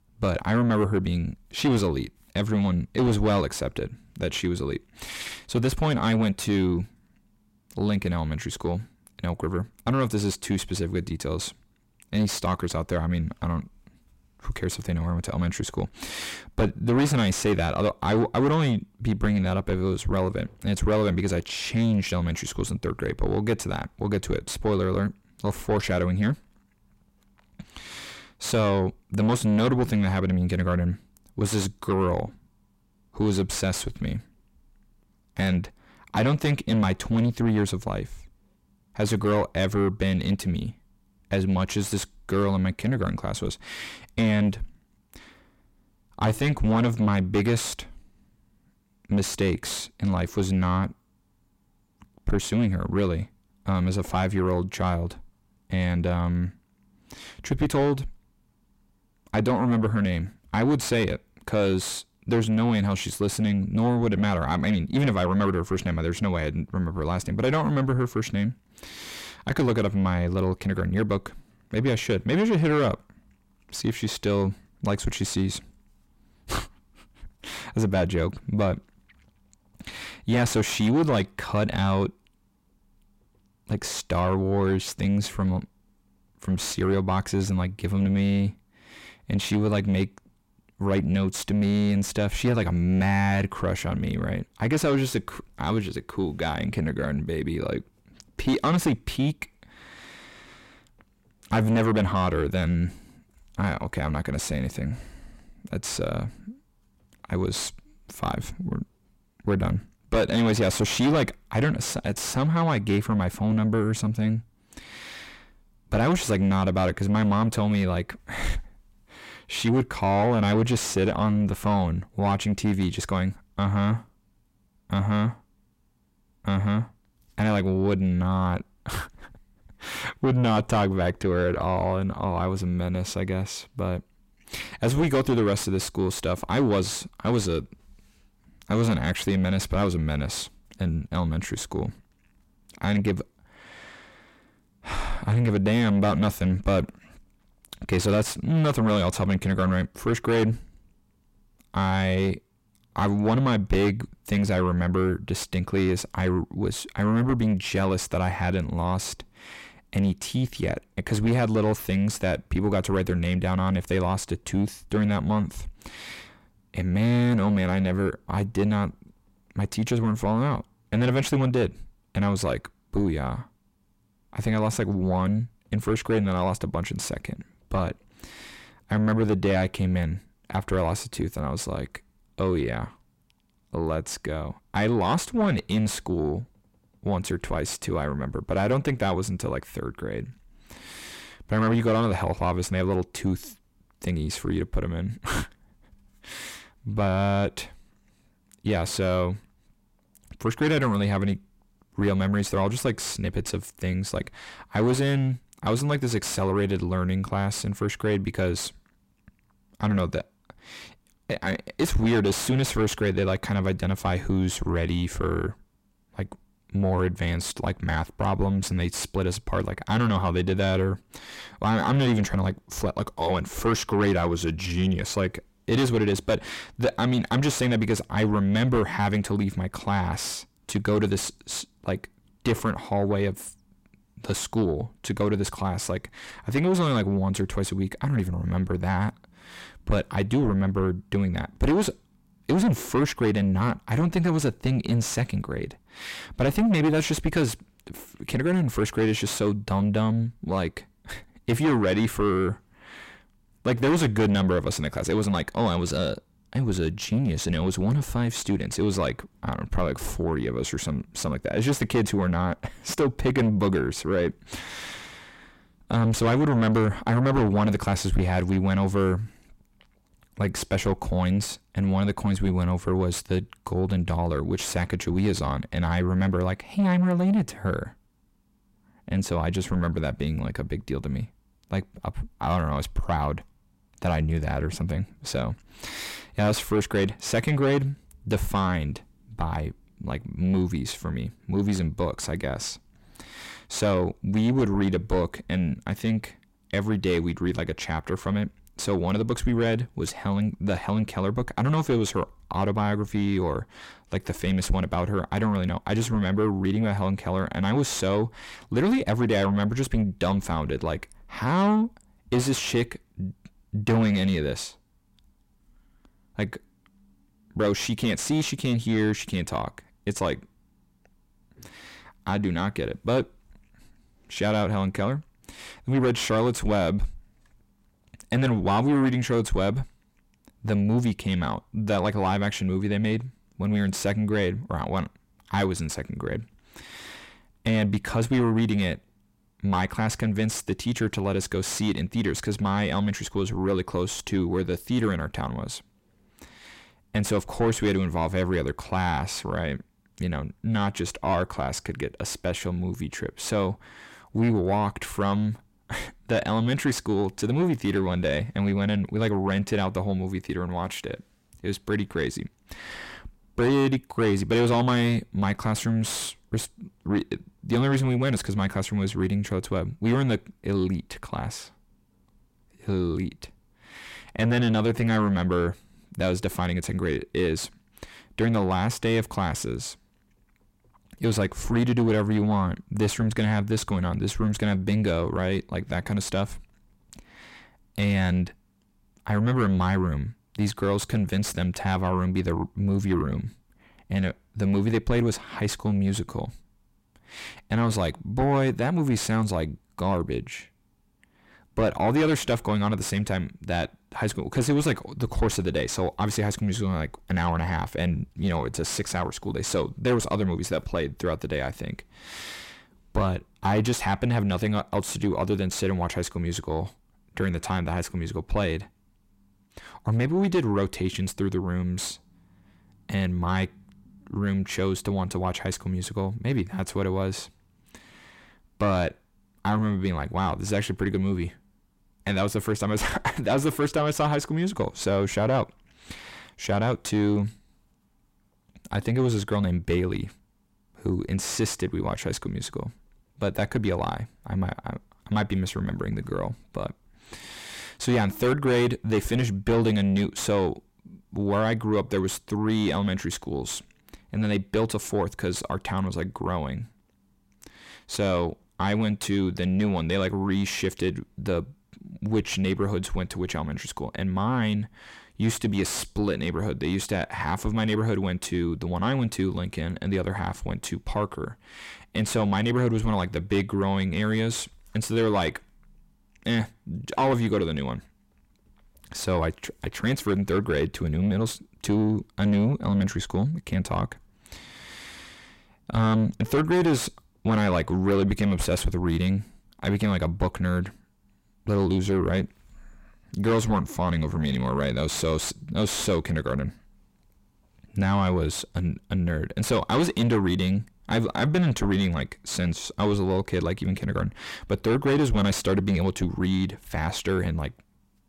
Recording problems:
distortion; heavy; 7 dB below the speech

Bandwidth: 16 kHz